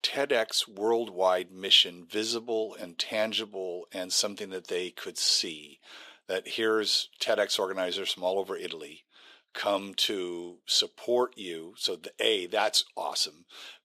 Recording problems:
thin; somewhat; fading below 450 Hz

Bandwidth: 14.5 kHz